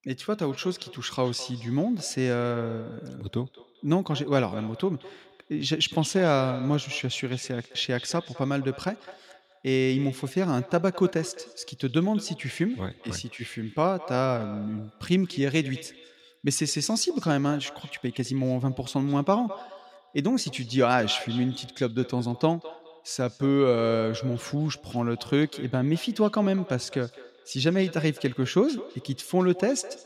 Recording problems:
echo of what is said; noticeable; throughout; 210 ms later, 15 dB below the speech

